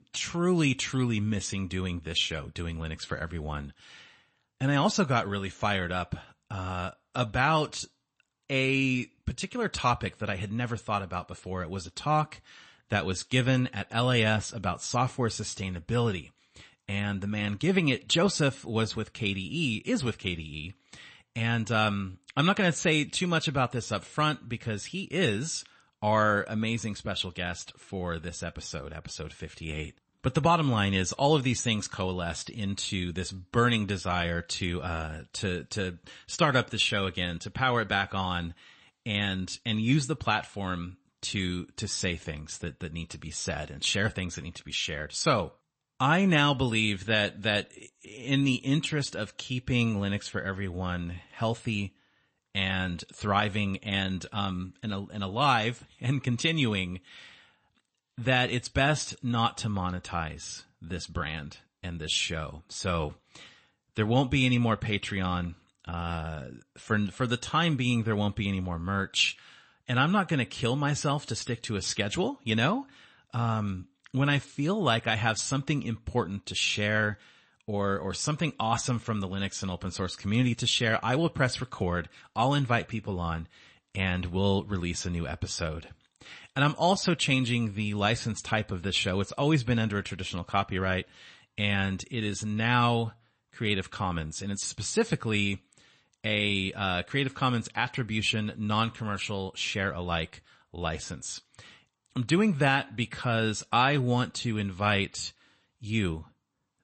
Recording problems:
garbled, watery; slightly; nothing above 8 kHz

